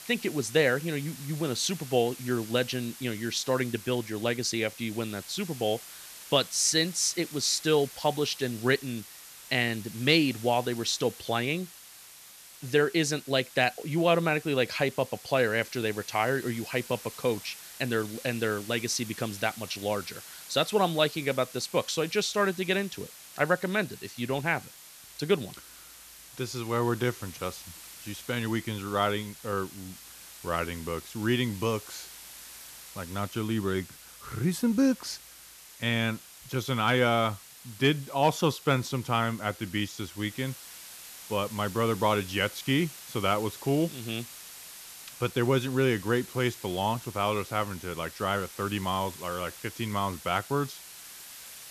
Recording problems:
hiss; noticeable; throughout; 15 dB below the speech

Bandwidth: 14 kHz